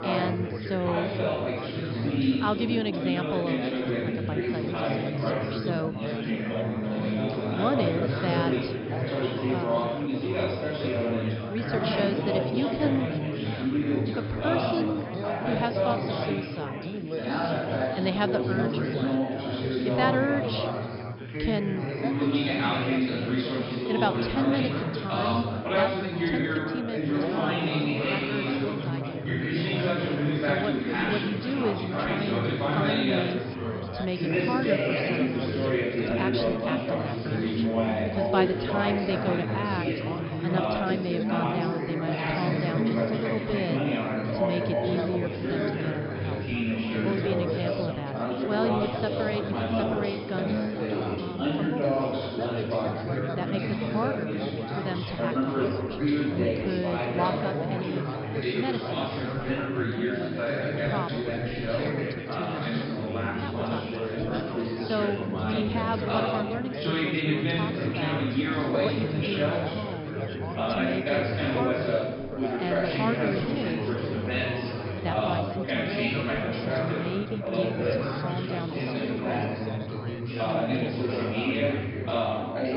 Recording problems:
high frequencies cut off; noticeable; nothing above 5.5 kHz
chatter from many people; very loud; throughout; 5 dB above the speech

